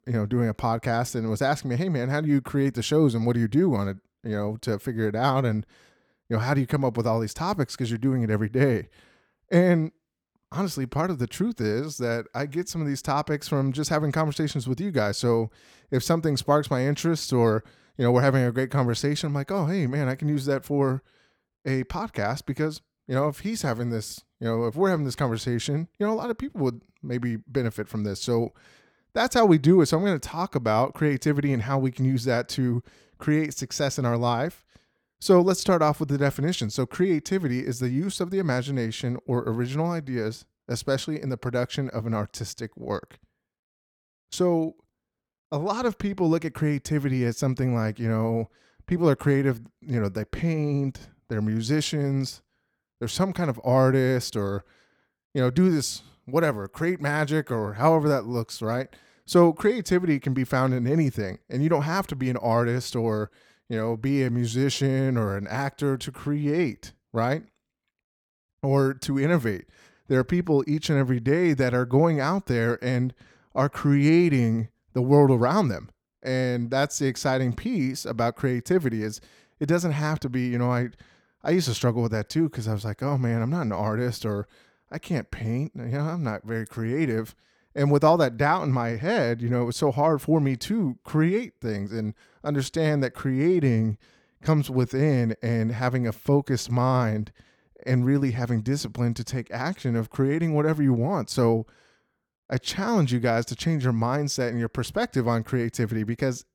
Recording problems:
none

